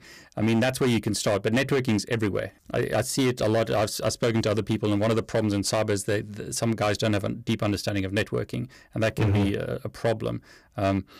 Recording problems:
distortion; slight; 10% of the sound clipped

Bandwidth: 15 kHz